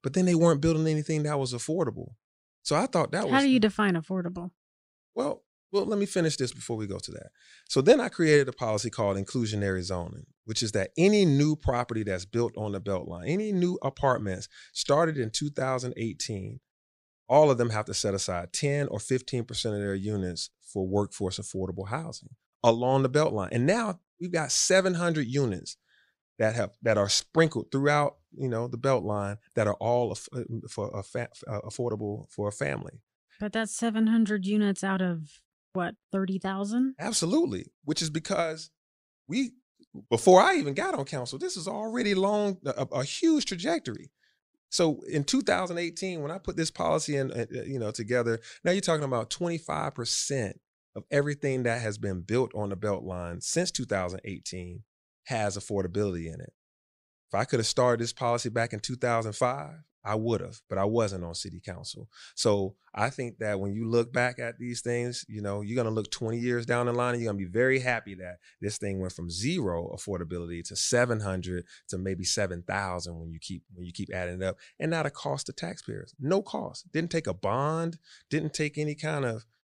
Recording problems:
none

